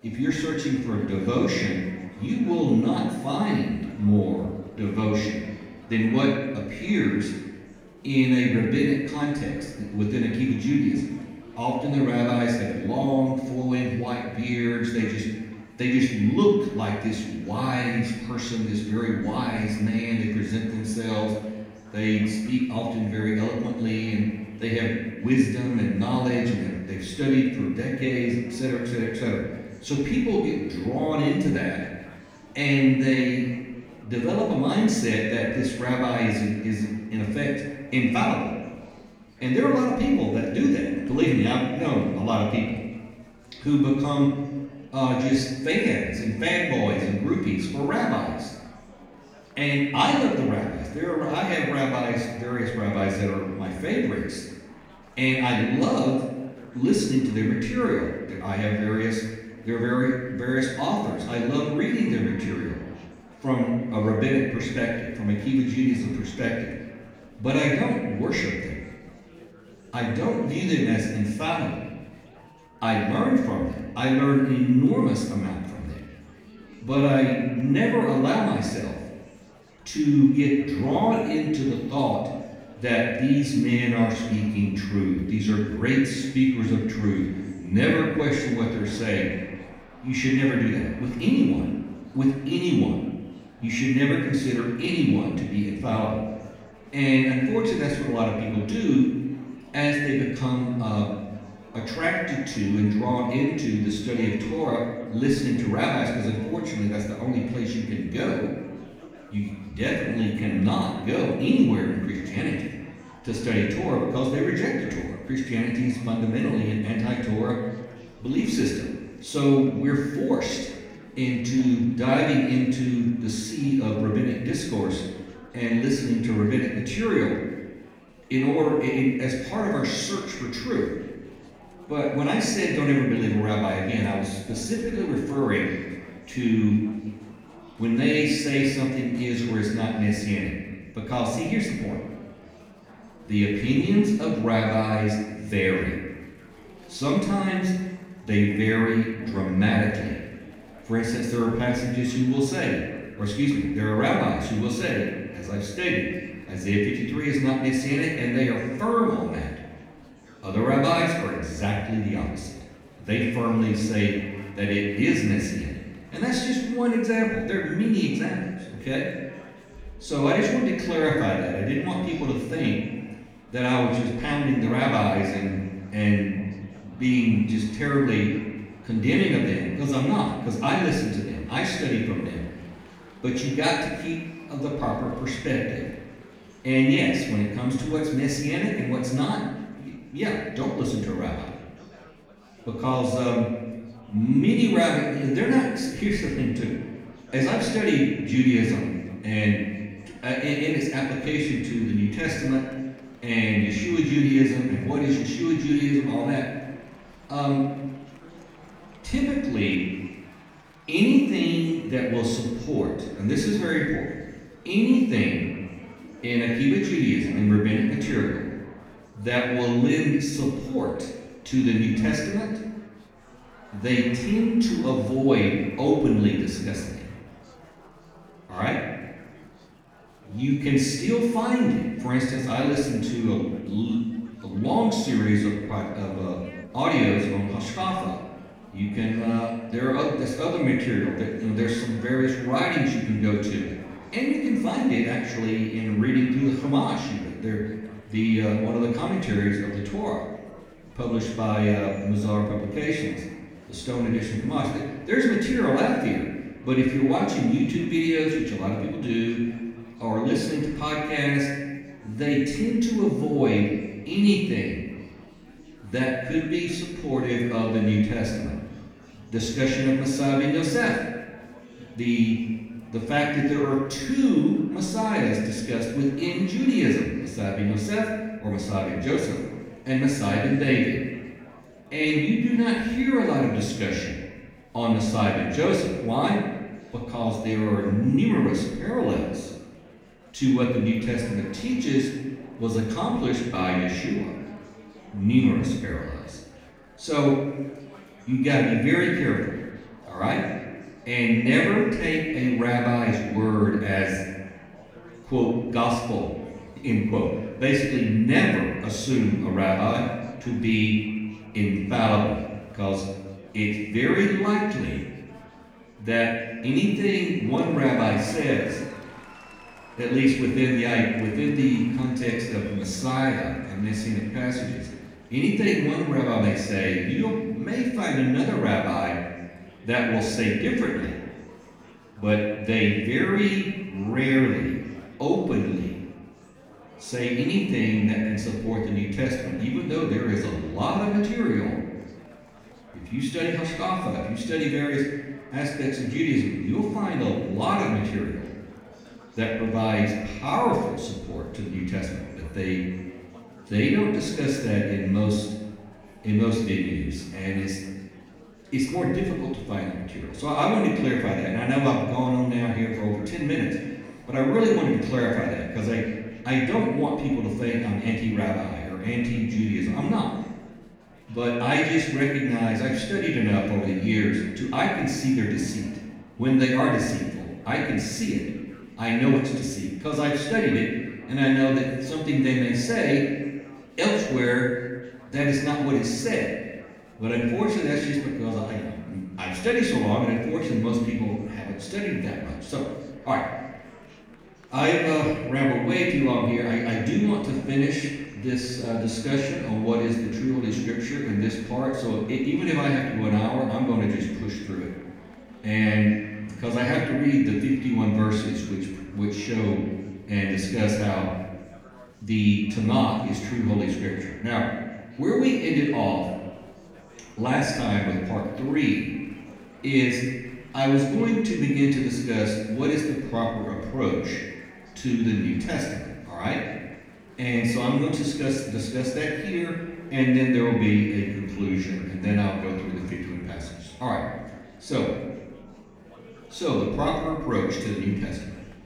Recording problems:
off-mic speech; far
room echo; noticeable; dies away in 1.1 s
murmuring crowd; faint; throughout; 25 dB below the speech

